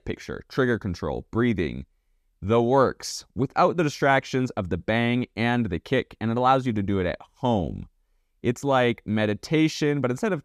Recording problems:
none

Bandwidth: 14.5 kHz